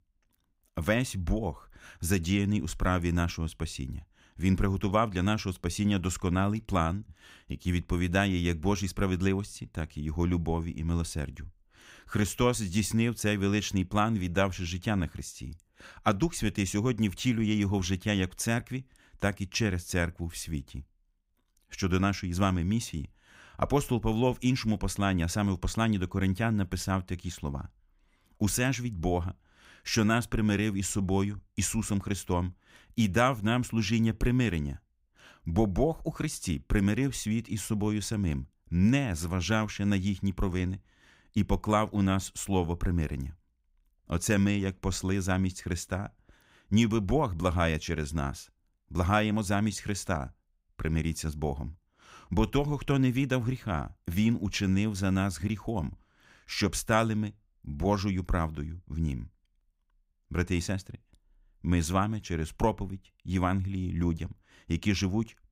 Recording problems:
none

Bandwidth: 15.5 kHz